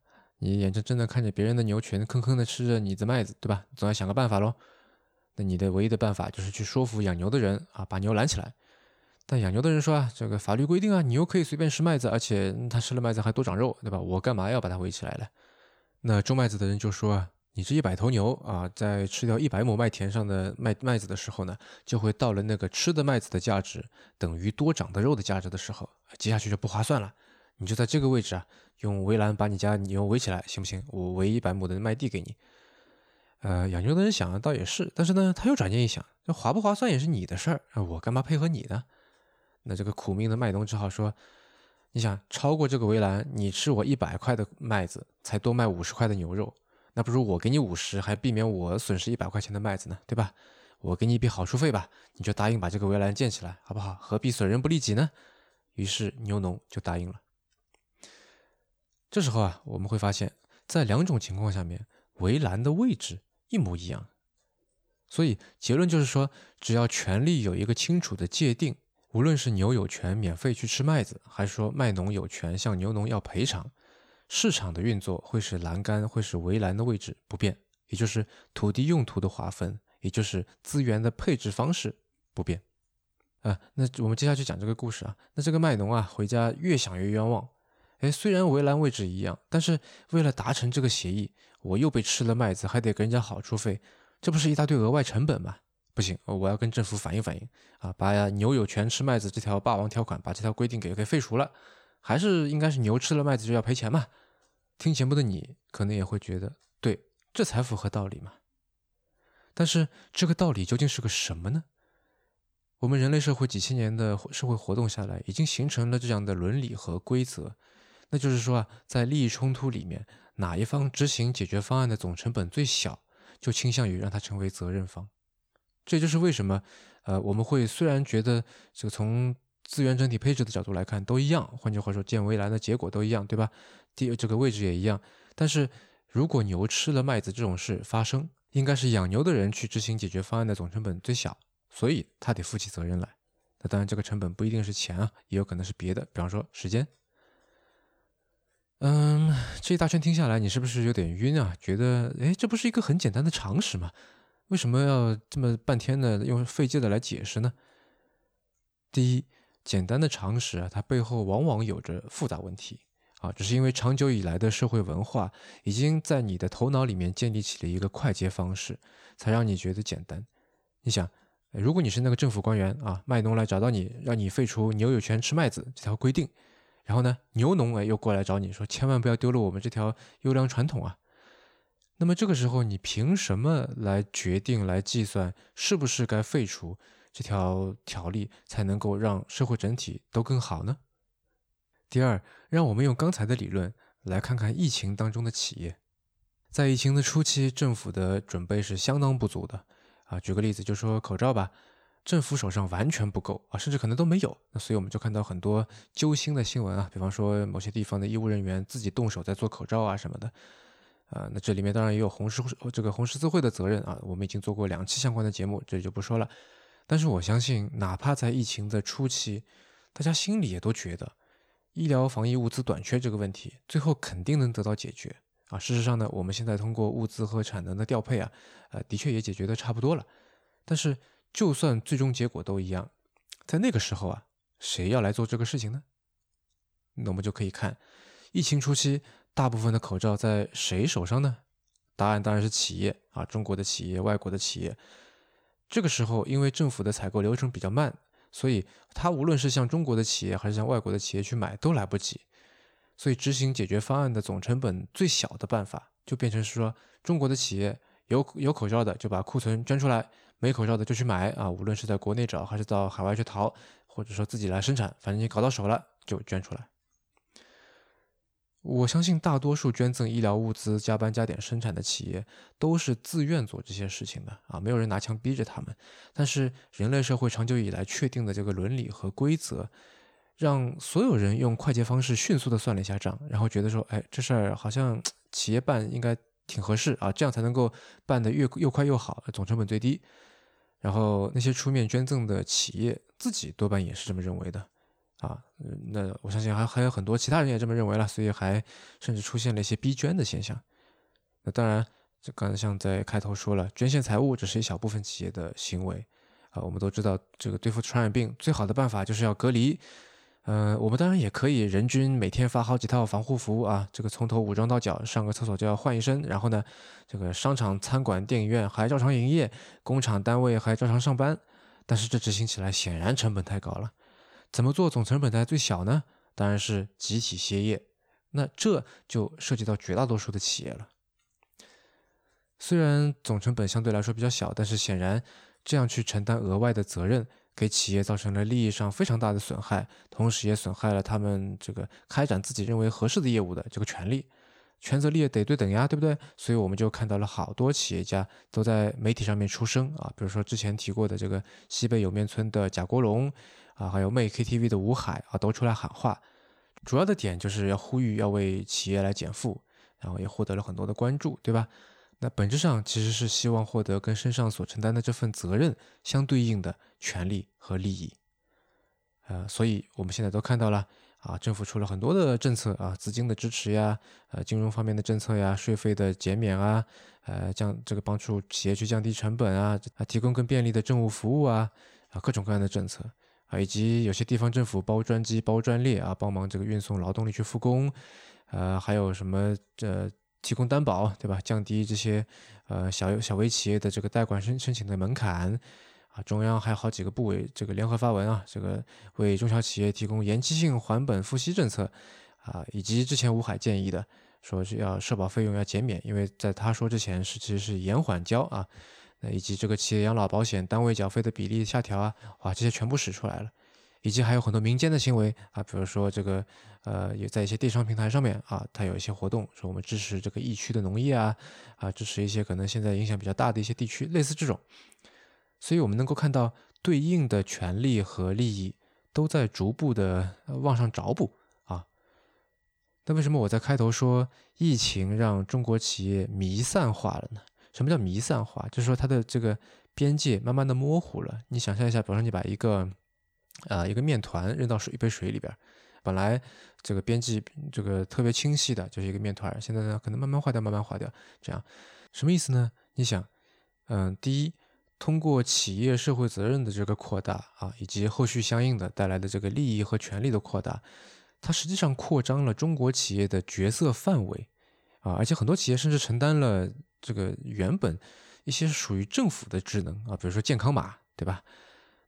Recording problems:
none

